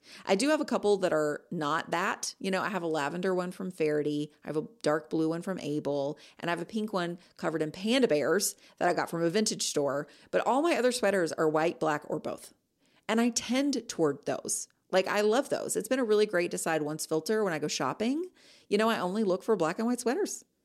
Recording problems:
none

